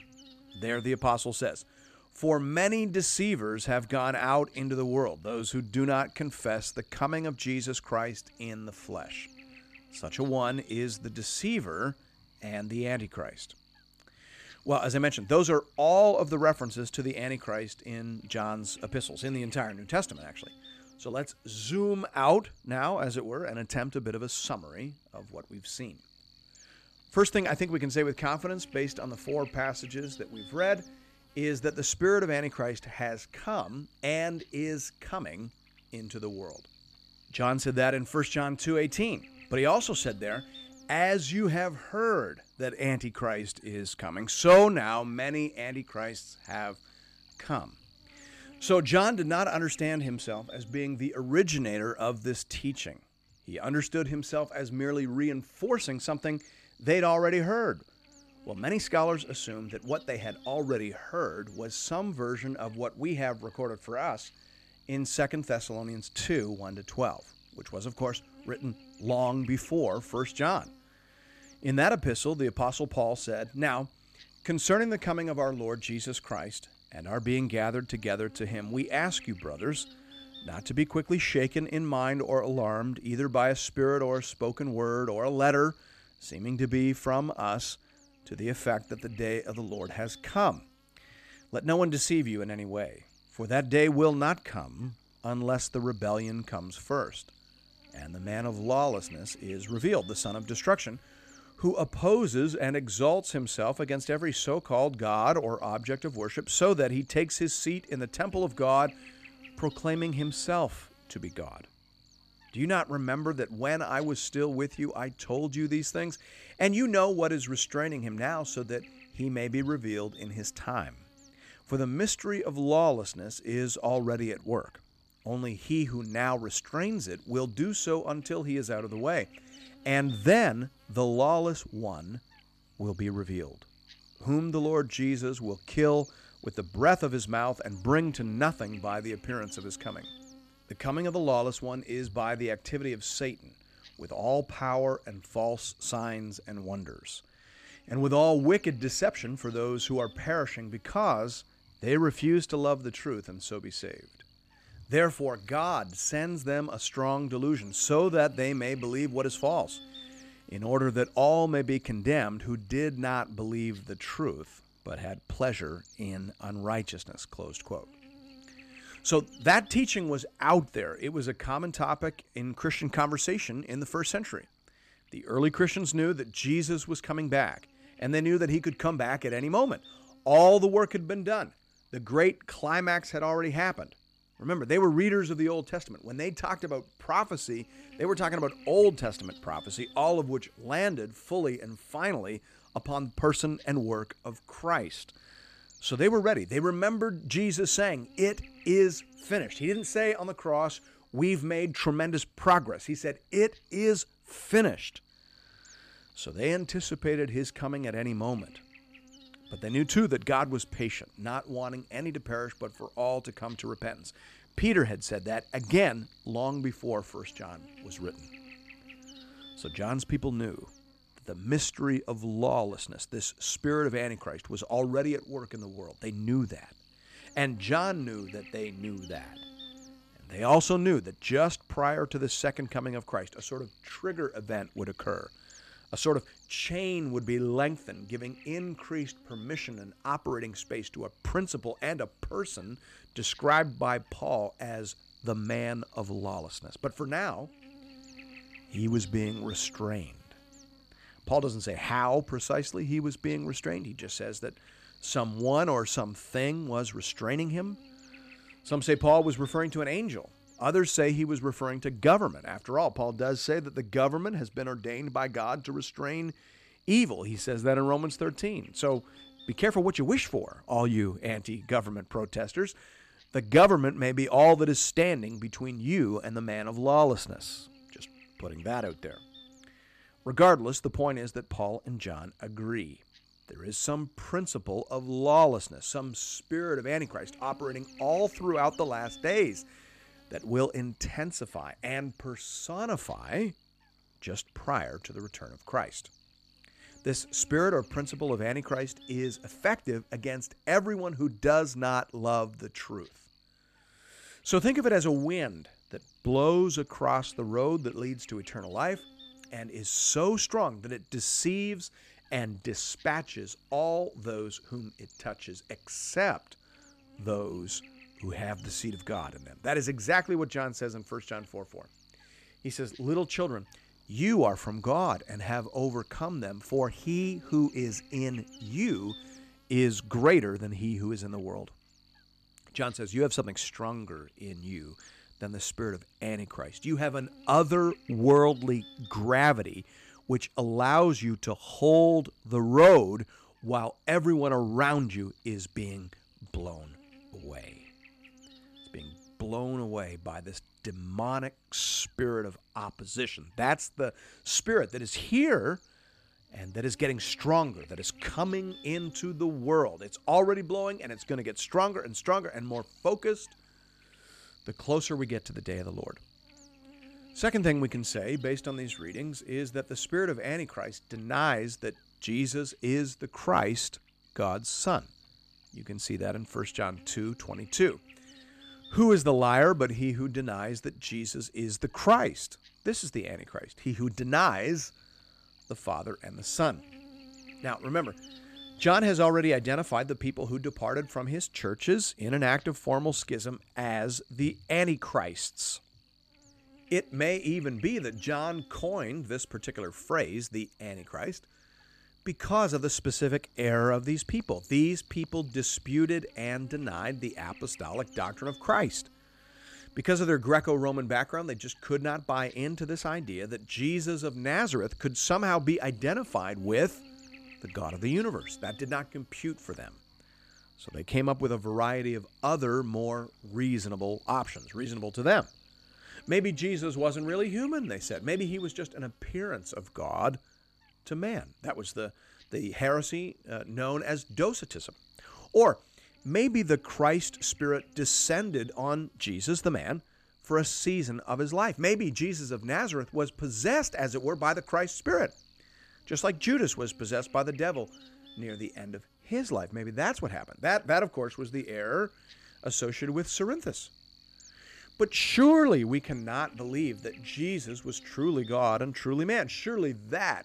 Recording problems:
electrical hum; faint; throughout; 50 Hz, 25 dB below the speech

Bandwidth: 14.5 kHz